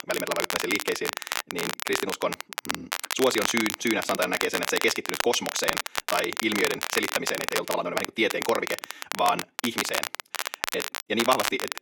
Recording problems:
wrong speed, natural pitch; too fast; 1.5 times normal speed
thin; very slightly; fading below 300 Hz
crackle, like an old record; loud; 3 dB below the speech

